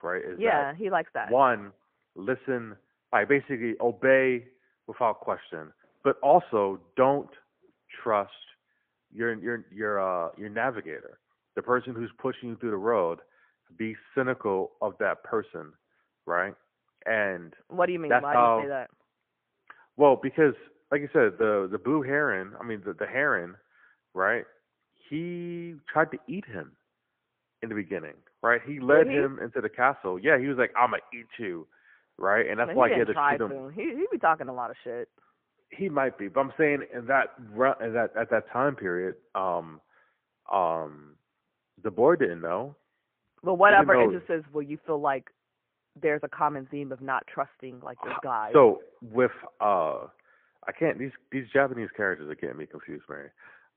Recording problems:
phone-call audio; poor line; nothing above 3 kHz
muffled; very slightly; fading above 2 kHz

